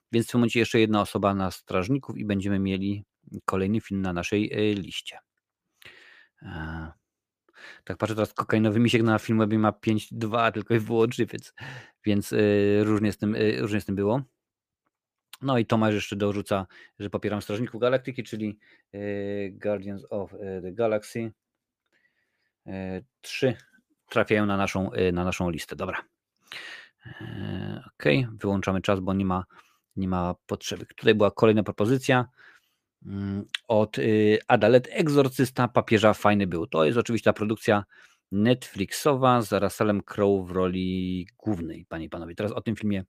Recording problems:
none

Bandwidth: 15 kHz